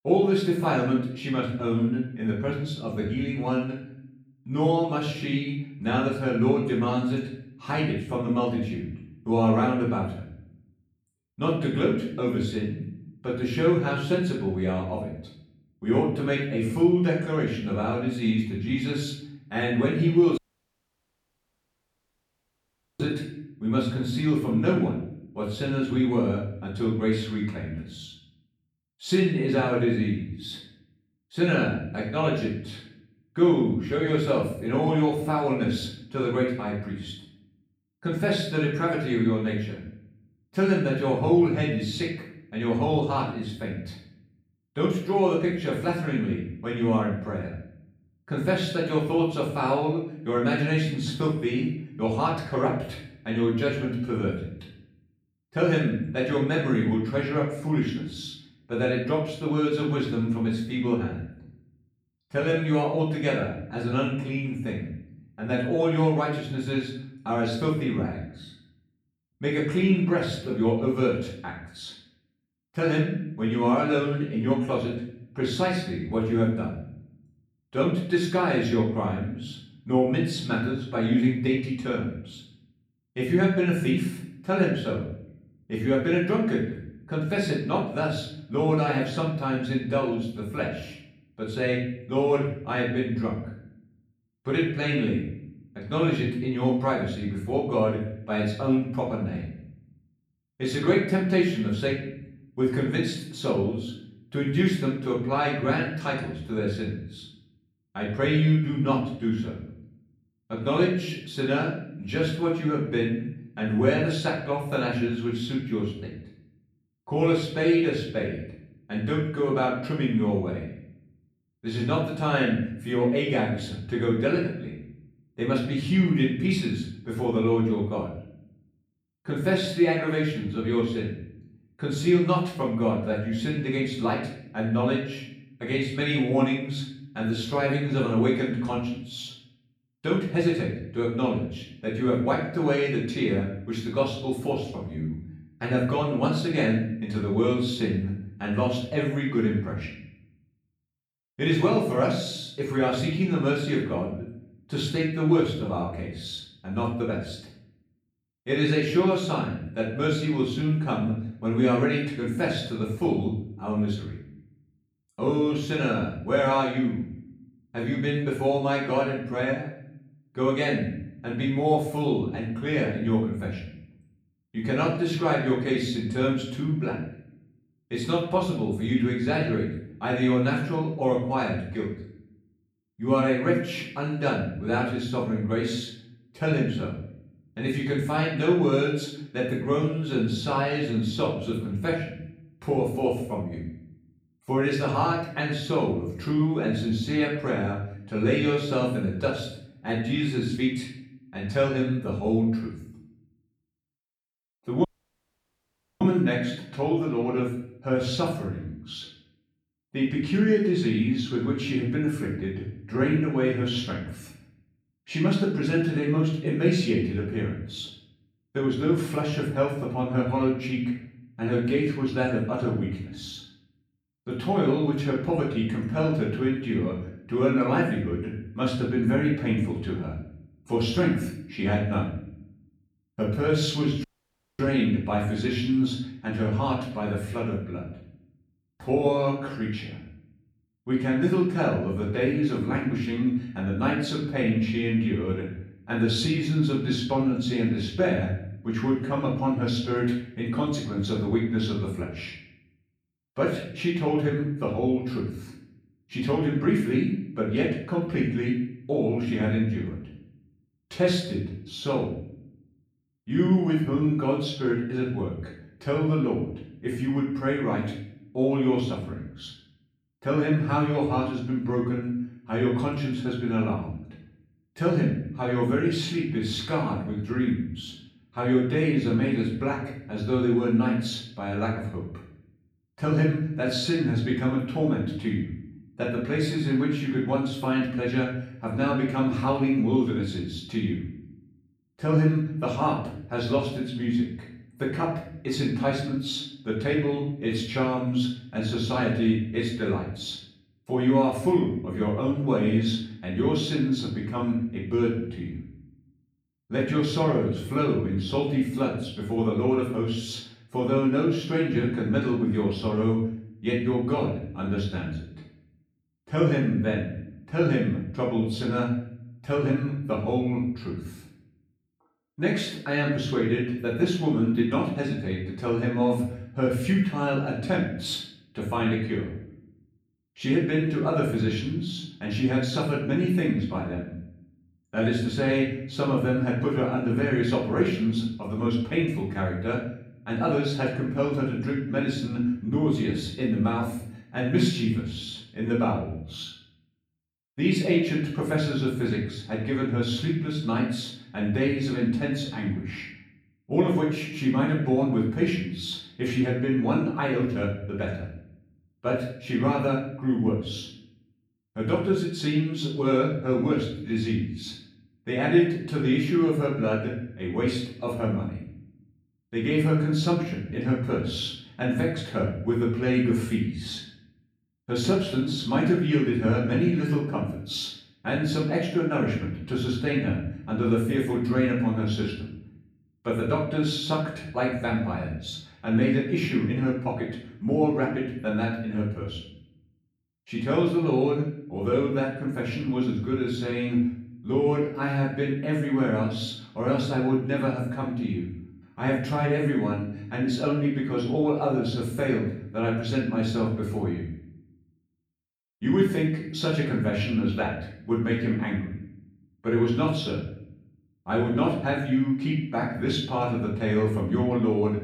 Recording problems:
off-mic speech; far
room echo; noticeable; dies away in 0.7 s
audio cutting out; at 20 s for 2.5 s, at 3:25 for 1 s and at 3:54 for 0.5 s

